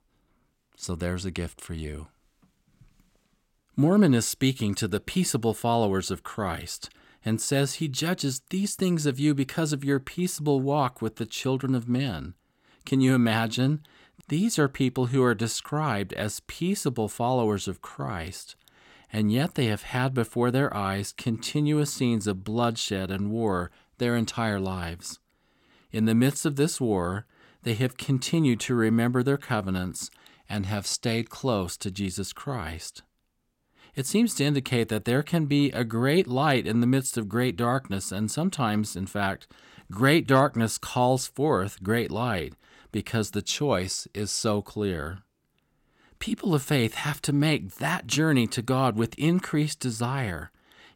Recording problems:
none

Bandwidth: 16.5 kHz